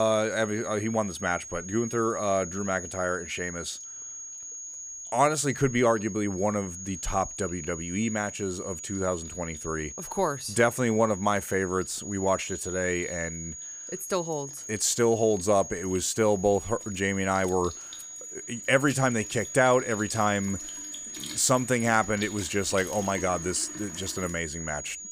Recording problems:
high-pitched whine; loud; throughout; 6.5 kHz, 10 dB below the speech
household noises; noticeable; throughout; 20 dB below the speech
abrupt cut into speech; at the start

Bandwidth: 15.5 kHz